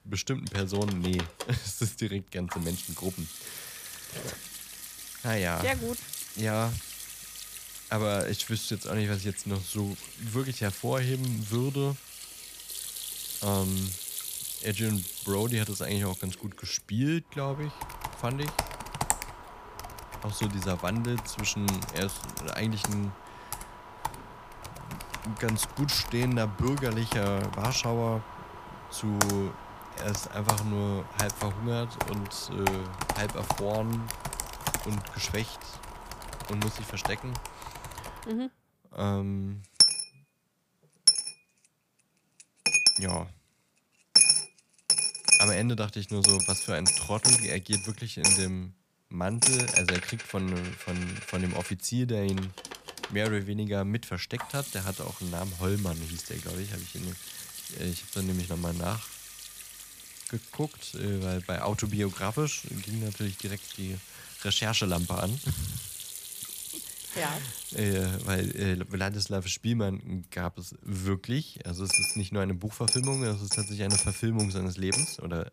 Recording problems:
household noises; very loud; throughout; 2 dB above the speech

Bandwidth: 15 kHz